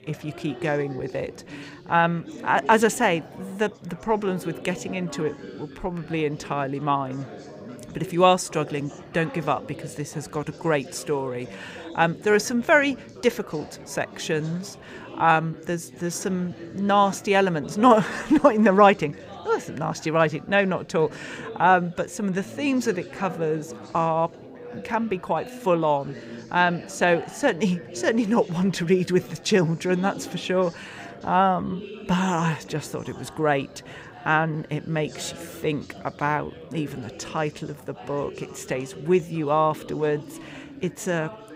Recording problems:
chatter from many people; noticeable; throughout; 15 dB below the speech

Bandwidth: 15.5 kHz